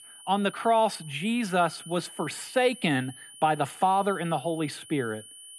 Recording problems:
high-pitched whine; noticeable; throughout; 9.5 kHz, 15 dB below the speech

